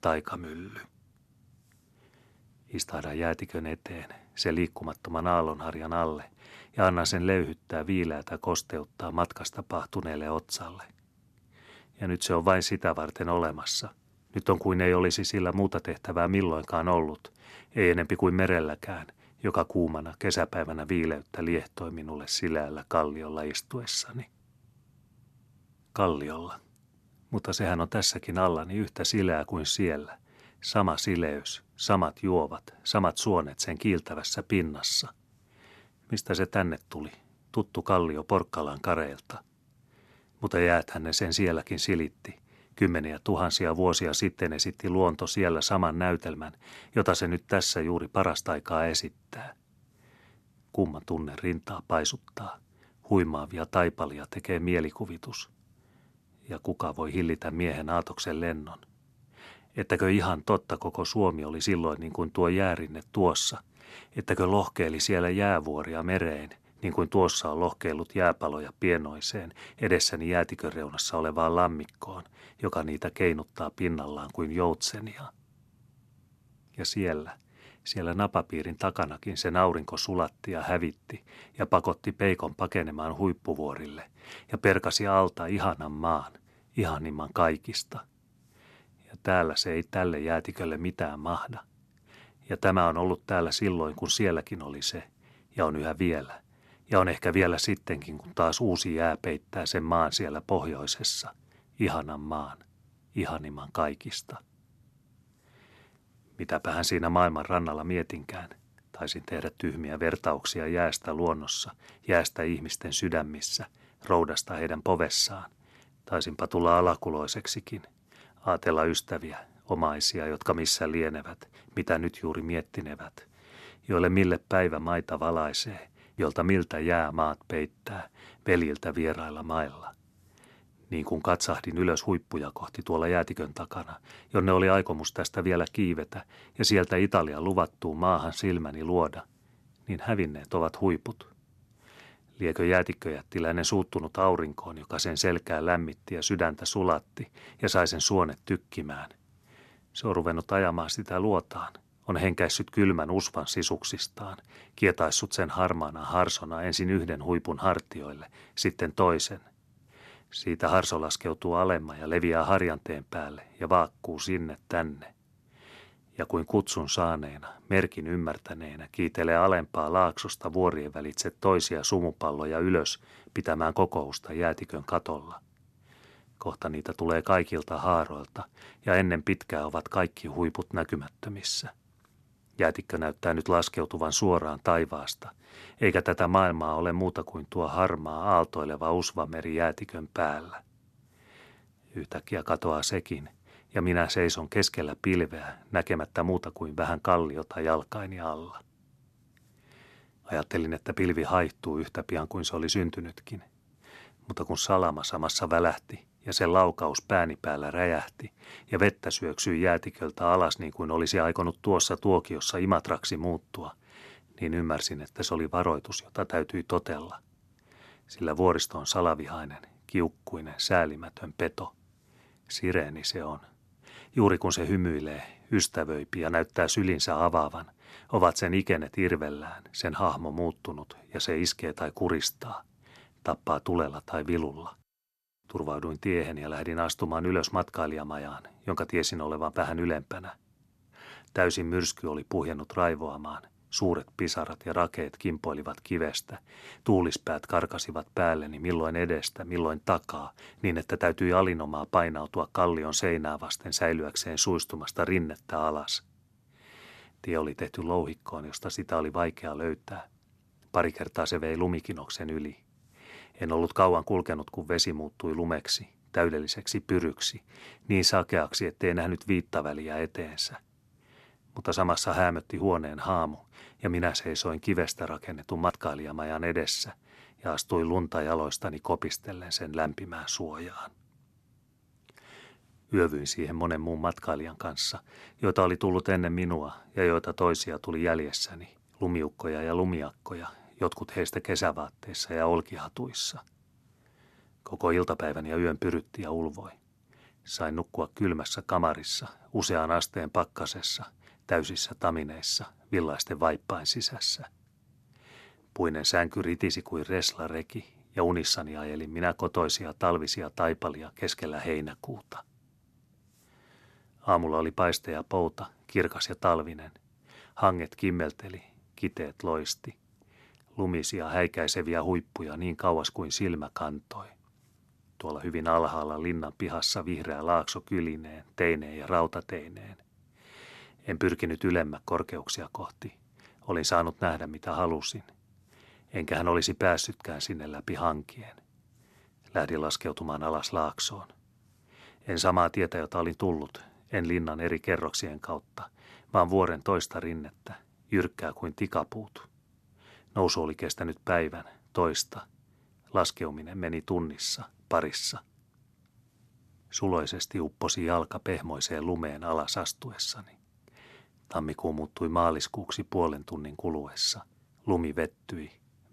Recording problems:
none

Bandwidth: 13.5 kHz